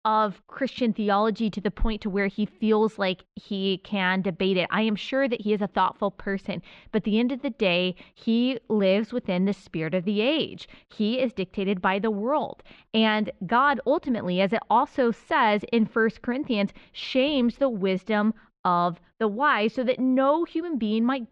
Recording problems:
muffled; slightly; fading above 3.5 kHz

